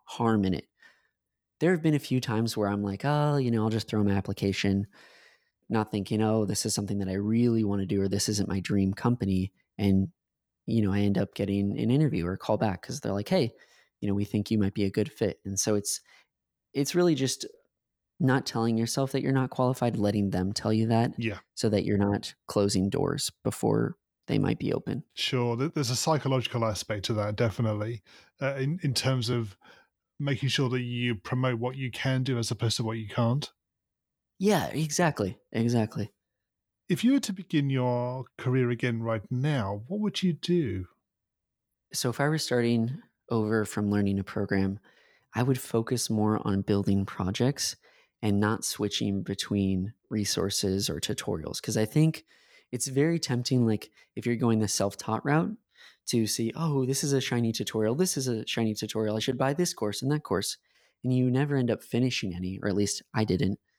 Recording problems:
none

